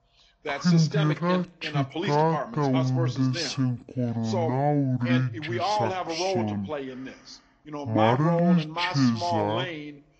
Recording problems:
wrong speed and pitch; too slow and too low; 0.6 times normal speed
garbled, watery; slightly
voice in the background; loud; throughout; 6 dB below the speech

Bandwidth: 8 kHz